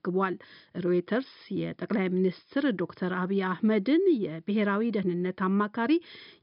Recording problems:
high frequencies cut off; noticeable; nothing above 5.5 kHz

